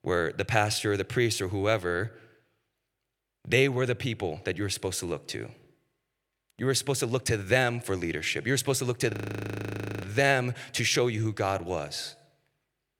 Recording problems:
audio freezing; at 9 s for 1 s

